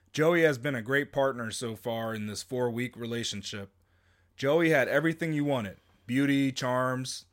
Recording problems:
none

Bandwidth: 16 kHz